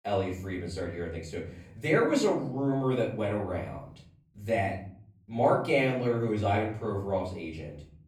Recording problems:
off-mic speech; far
room echo; slight; dies away in 0.8 s

